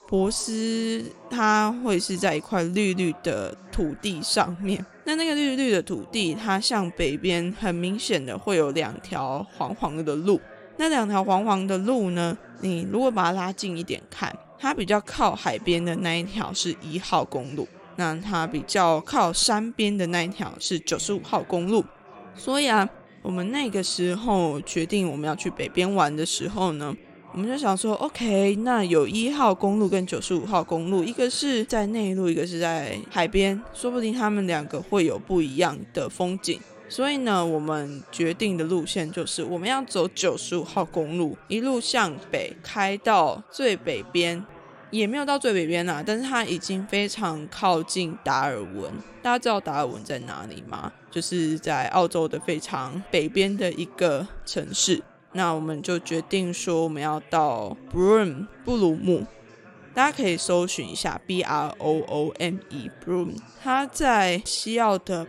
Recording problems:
background chatter; faint; throughout; 3 voices, 20 dB below the speech

